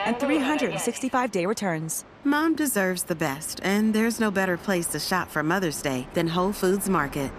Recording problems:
train or aircraft noise; noticeable; throughout; 10 dB below the speech

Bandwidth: 14.5 kHz